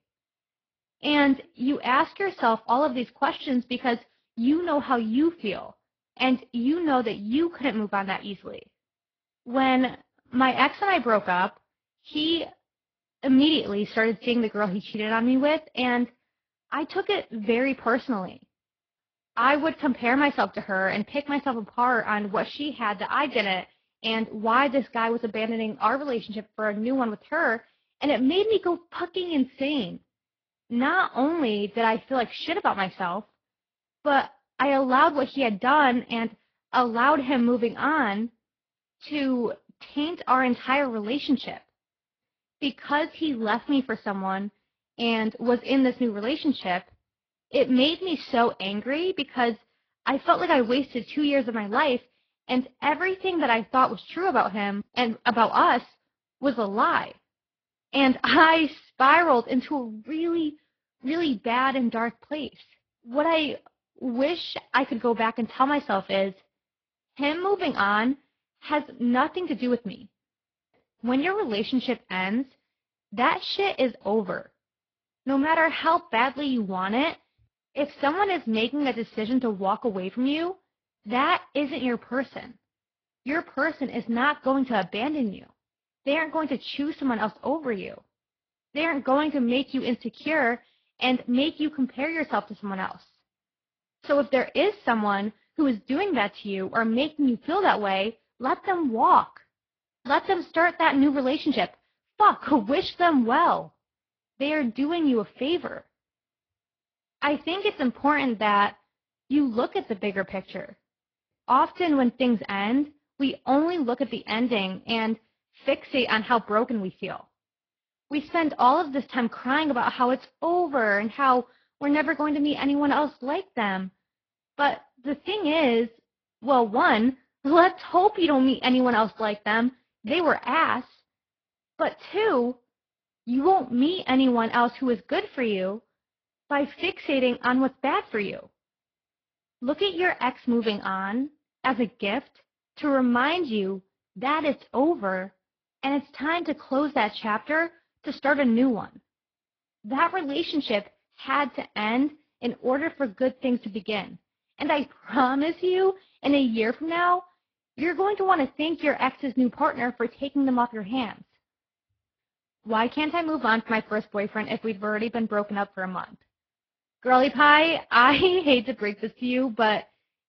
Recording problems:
garbled, watery; badly; nothing above 5 kHz

